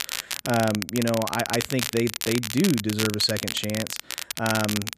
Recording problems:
crackle, like an old record; loud; 4 dB below the speech

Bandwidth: 14.5 kHz